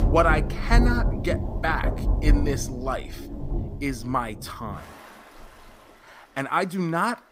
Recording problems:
rain or running water; very loud; throughout; as loud as the speech

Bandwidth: 15.5 kHz